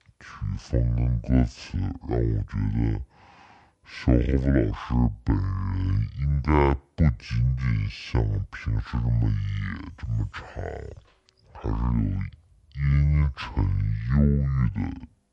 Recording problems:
wrong speed and pitch; too slow and too low; 0.6 times normal speed

